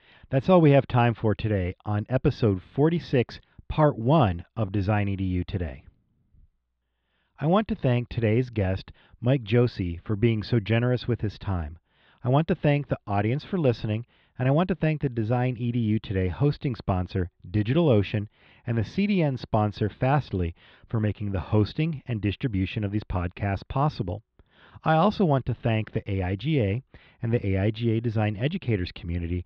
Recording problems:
muffled; very; fading above 3.5 kHz

